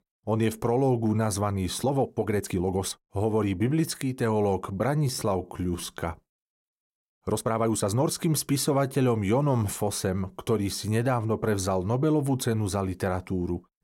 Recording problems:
uneven, jittery; strongly; from 2 to 8 s

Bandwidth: 16 kHz